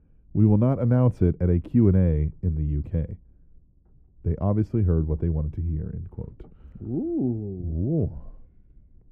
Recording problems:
muffled; very; fading above 1 kHz

